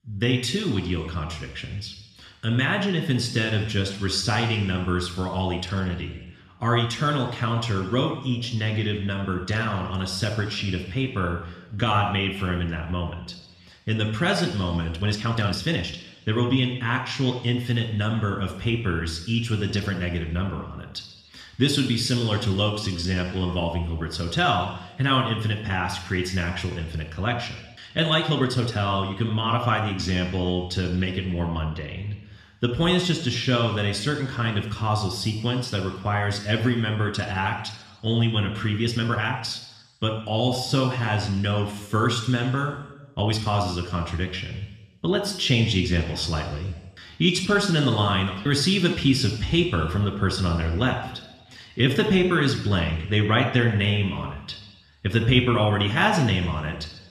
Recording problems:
room echo; slight; dies away in 1 s
off-mic speech; somewhat distant
uneven, jittery; strongly; from 12 to 52 s

